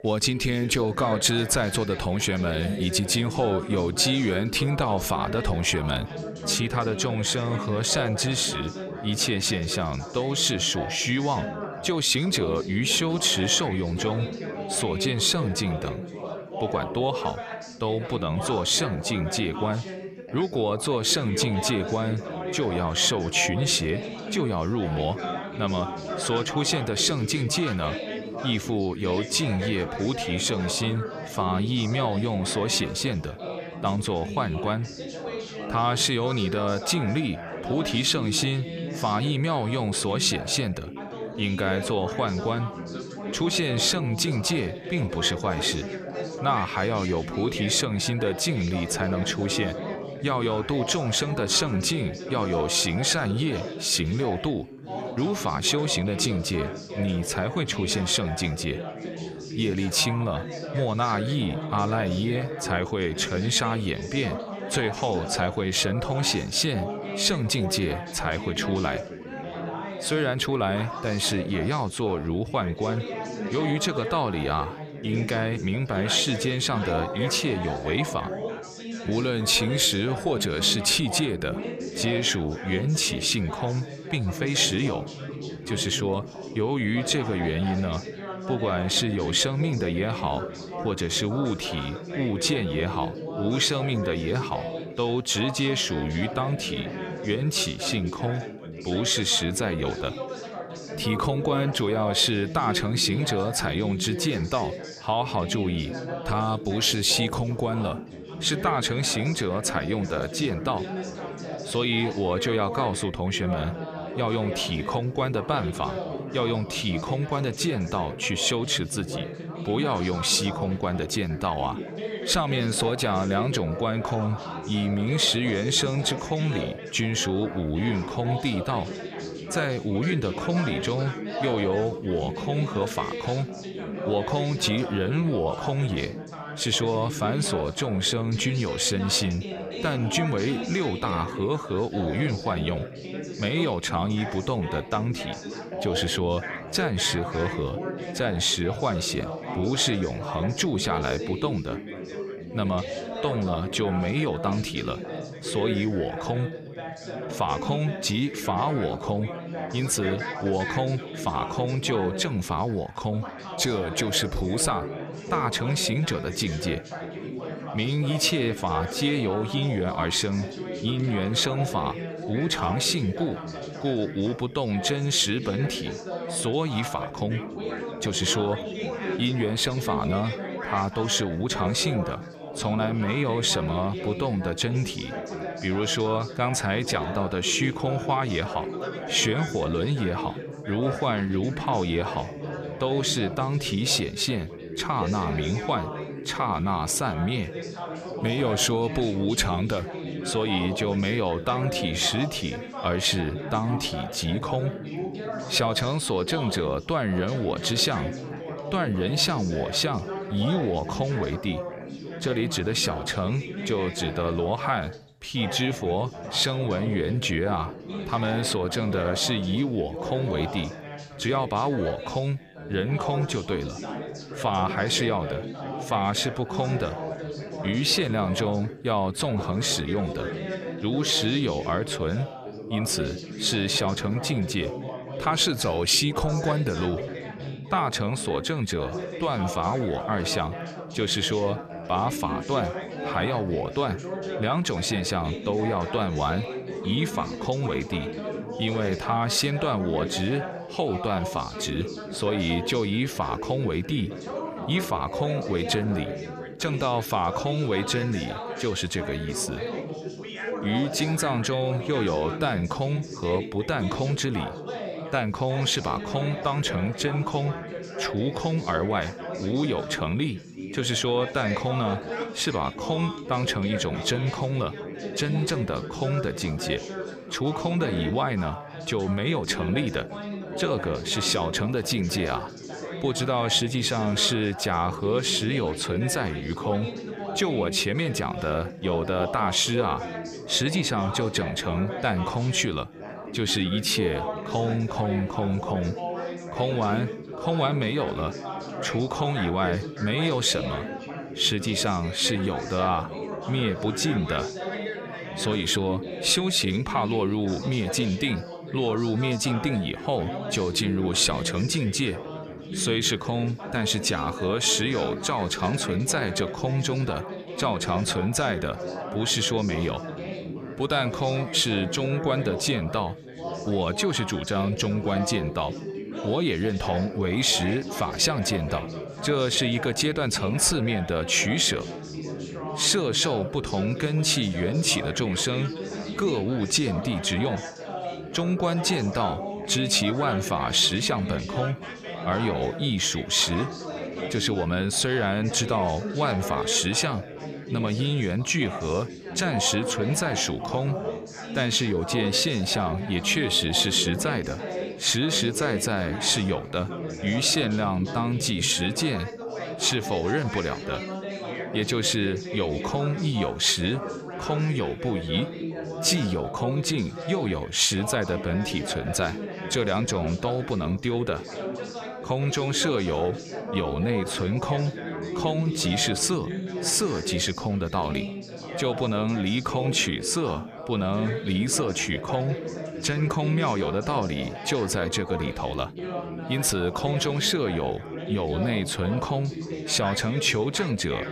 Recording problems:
background chatter; loud; throughout; 4 voices, 8 dB below the speech

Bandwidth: 14.5 kHz